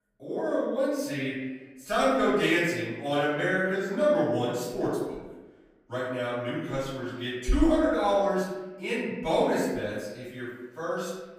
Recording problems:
off-mic speech; far
room echo; noticeable; dies away in 1 s

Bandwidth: 15.5 kHz